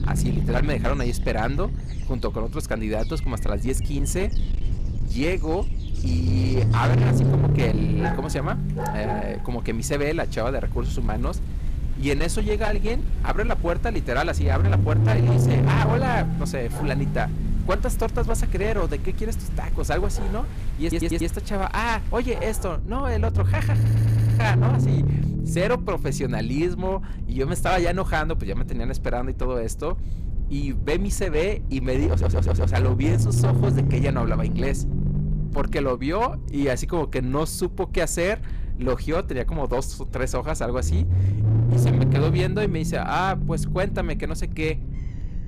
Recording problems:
distortion; slight; 10% of the sound clipped
low rumble; loud; throughout; 8 dB below the speech
animal sounds; noticeable; throughout; 15 dB below the speech
audio stuttering; at 21 s, at 24 s and at 32 s

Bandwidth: 14.5 kHz